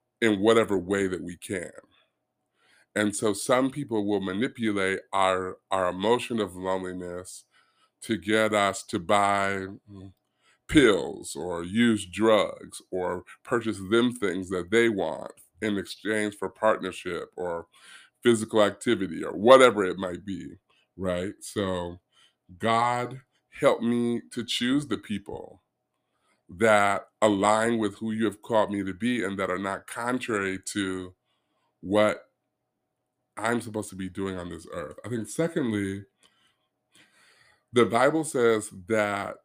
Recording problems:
none

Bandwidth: 15 kHz